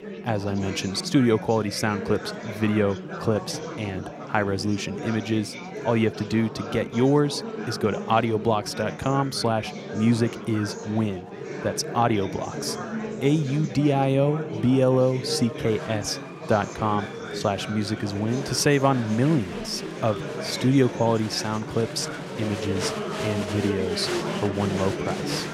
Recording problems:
chatter from many people; loud; throughout; 8 dB below the speech

